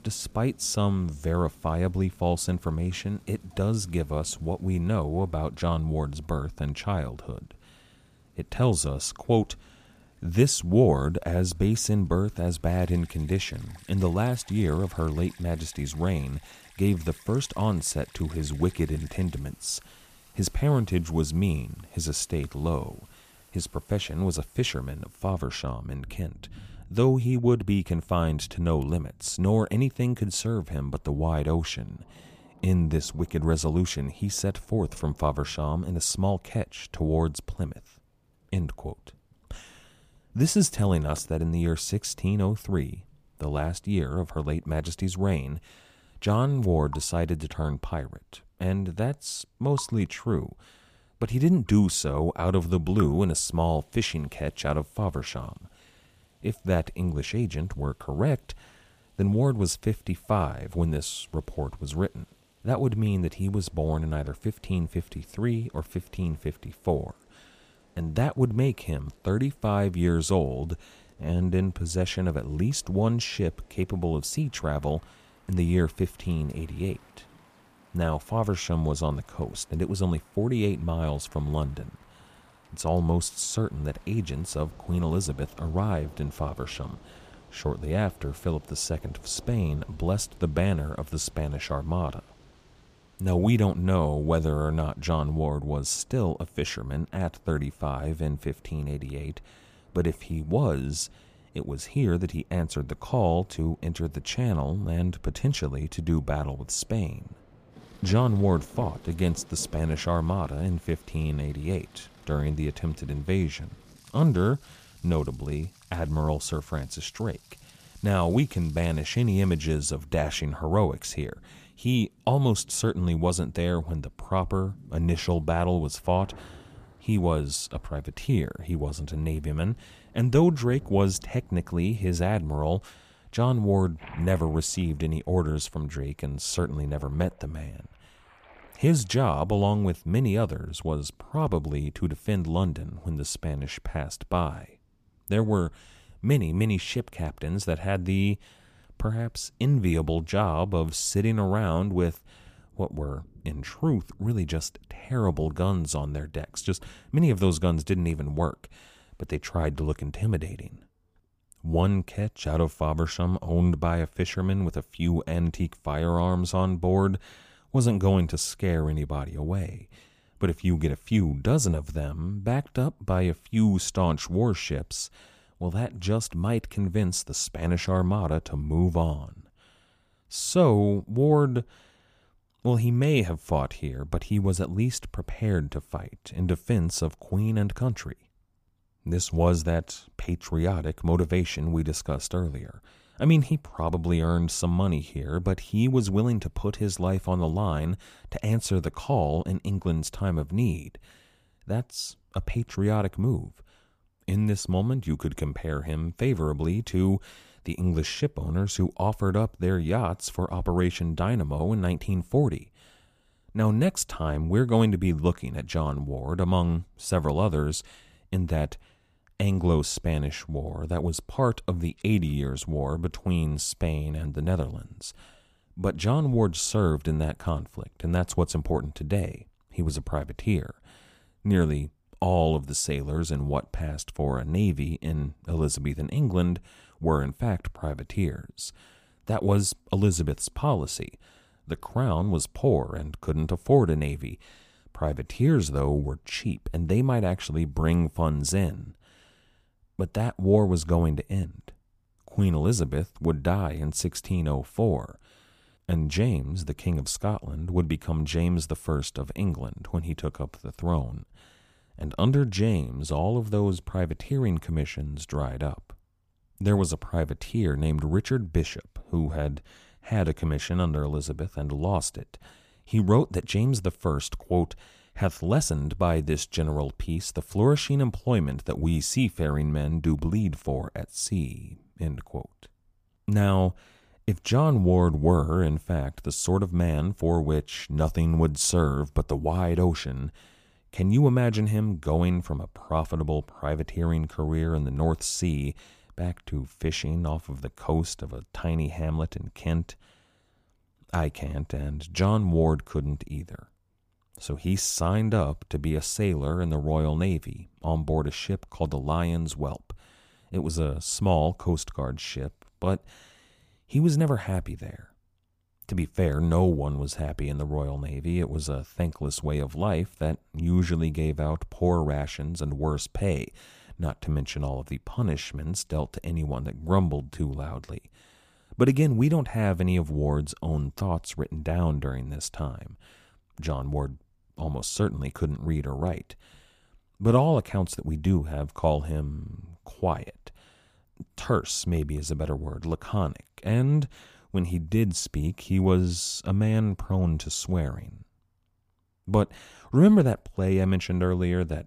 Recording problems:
rain or running water; faint; until 2:39; 25 dB below the speech

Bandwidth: 15 kHz